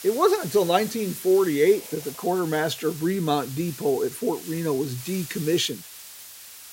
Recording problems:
hiss; noticeable; throughout; 15 dB below the speech

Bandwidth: 16 kHz